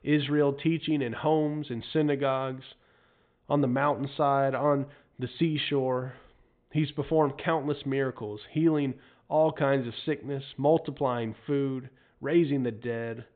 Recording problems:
high frequencies cut off; severe; nothing above 4 kHz

